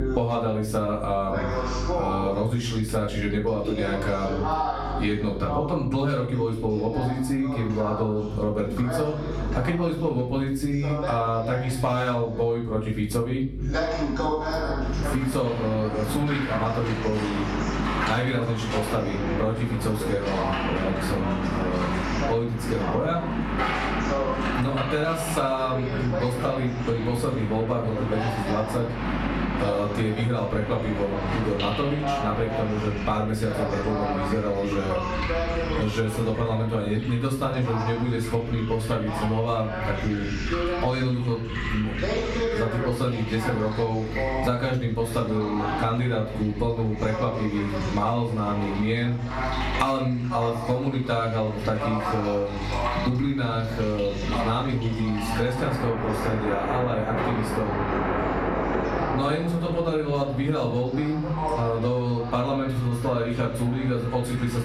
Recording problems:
off-mic speech; far
room echo; slight; dies away in 0.4 s
squashed, flat; somewhat
rain or running water; loud; from 15 s on; 6 dB below the speech
voice in the background; loud; throughout; 7 dB below the speech
electrical hum; faint; throughout; 50 Hz, 20 dB below the speech

